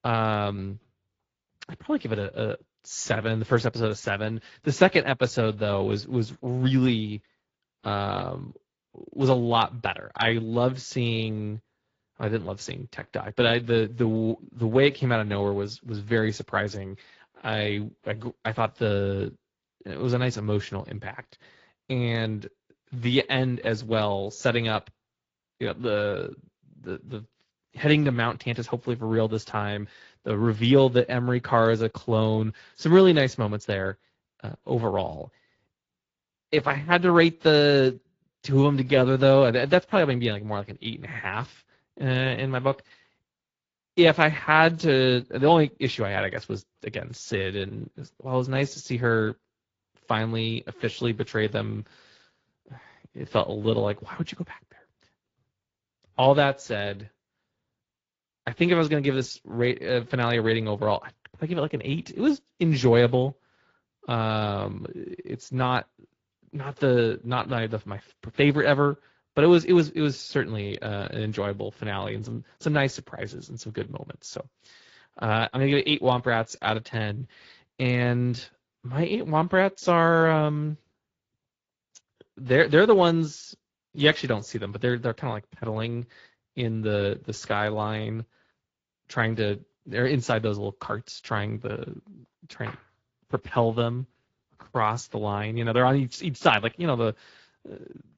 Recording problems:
garbled, watery; slightly; nothing above 7.5 kHz

